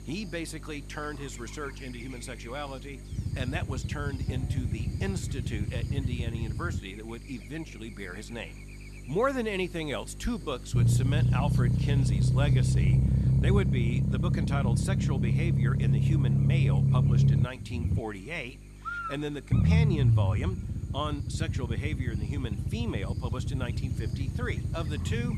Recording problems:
low rumble; loud; from 3 to 7 s, from 11 to 18 s and from 20 s on; 2 dB below the speech
electrical hum; noticeable; throughout; 50 Hz, 10 dB below the speech

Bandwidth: 13.5 kHz